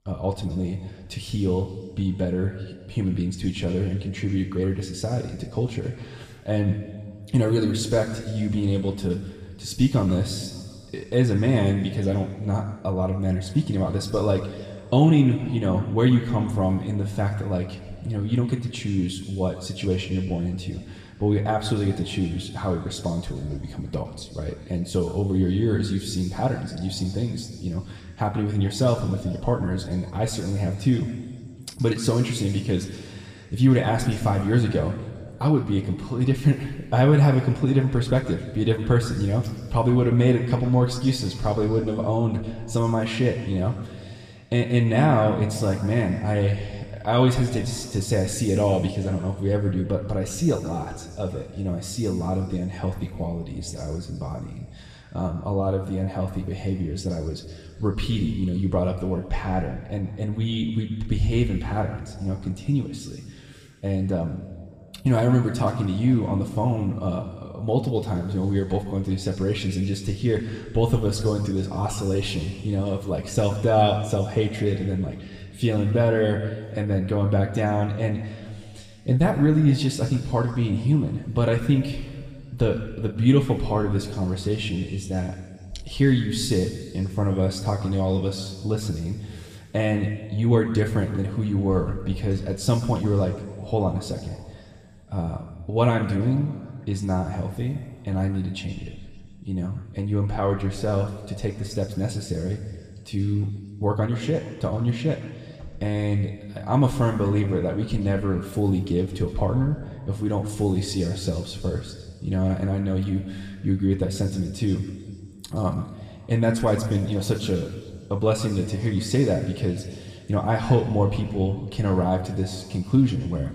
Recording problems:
room echo; slight; dies away in 2.1 s
off-mic speech; somewhat distant

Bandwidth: 15 kHz